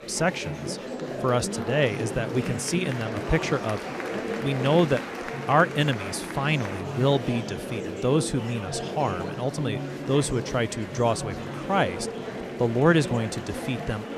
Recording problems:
murmuring crowd; loud; throughout; 7 dB below the speech

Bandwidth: 14.5 kHz